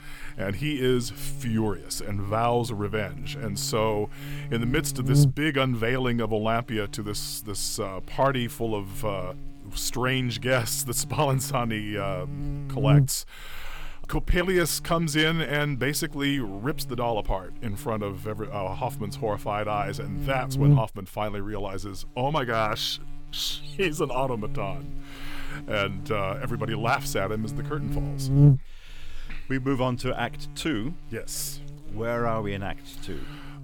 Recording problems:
electrical hum; noticeable; throughout; 60 Hz, 10 dB below the speech

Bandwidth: 17.5 kHz